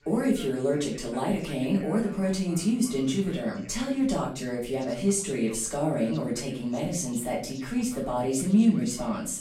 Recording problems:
off-mic speech; far
room echo; slight; dies away in 0.4 s
voice in the background; faint; throughout; 20 dB below the speech

